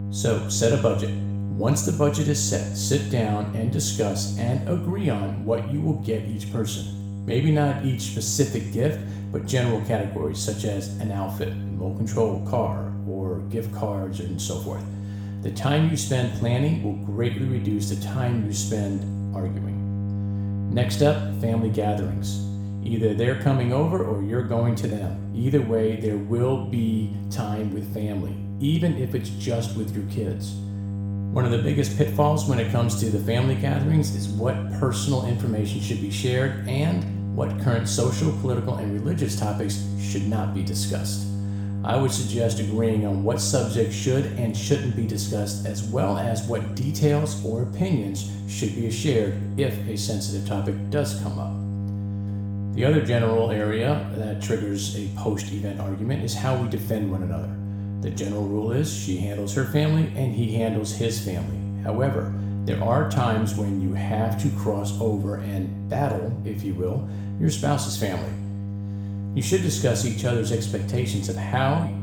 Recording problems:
room echo; noticeable; dies away in 0.7 s
off-mic speech; somewhat distant
electrical hum; noticeable; throughout; 50 Hz, 10 dB below the speech

